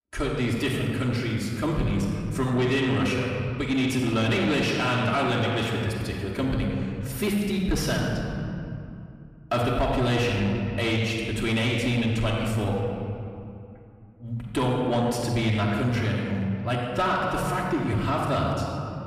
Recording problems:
off-mic speech; far
room echo; noticeable; dies away in 2.1 s
distortion; slight; 10 dB below the speech

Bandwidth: 14.5 kHz